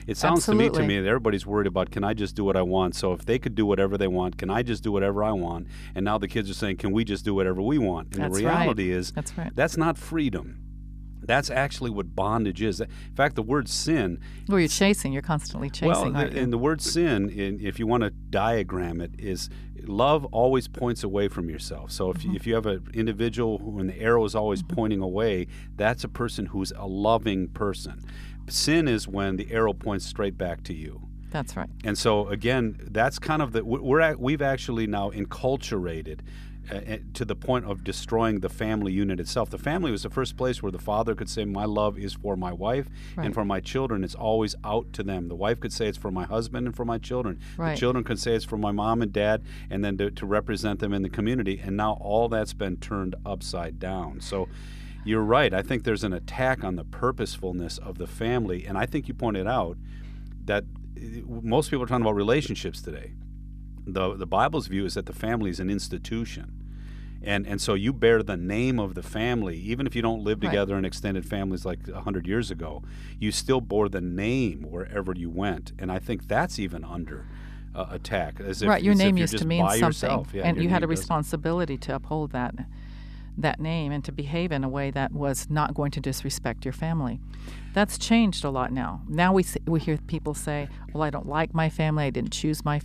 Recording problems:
electrical hum; faint; throughout; 50 Hz, 30 dB below the speech

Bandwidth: 14.5 kHz